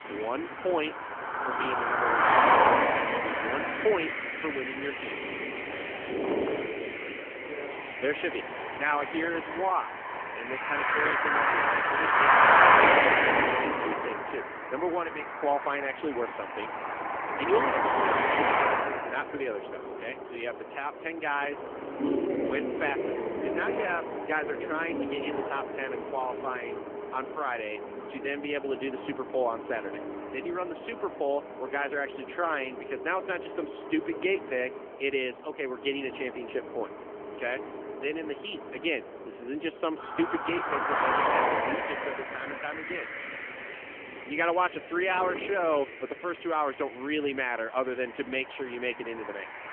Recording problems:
phone-call audio; nothing above 3 kHz
traffic noise; very loud; throughout; 4 dB above the speech

